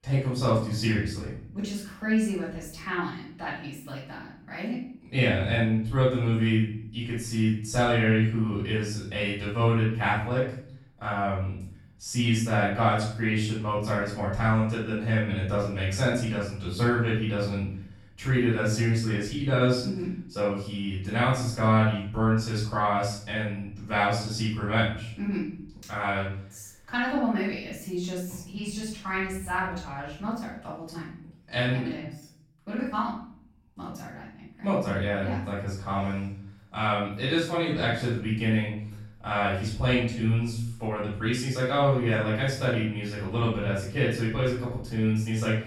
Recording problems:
off-mic speech; far
room echo; noticeable; dies away in 0.6 s

